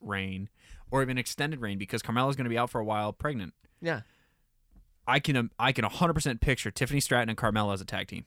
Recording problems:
none

